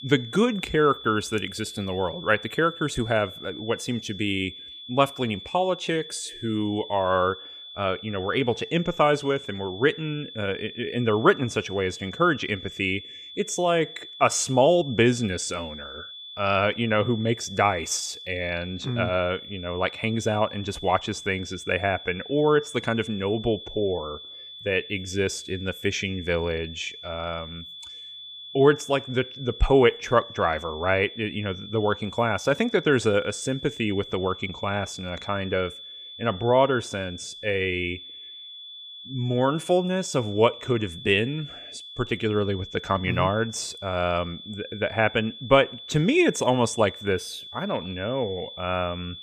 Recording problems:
high-pitched whine; noticeable; throughout; 3.5 kHz, 15 dB below the speech

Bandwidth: 15 kHz